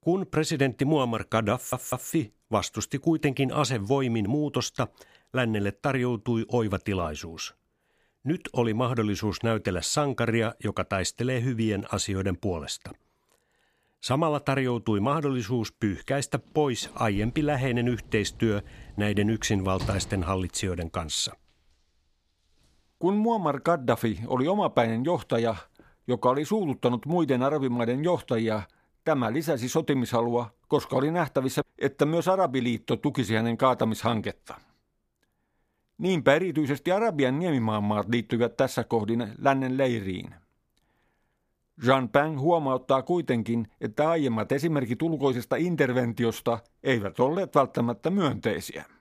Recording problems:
audio stuttering; at 1.5 s
door banging; noticeable; from 17 to 20 s; peak 8 dB below the speech

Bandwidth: 15 kHz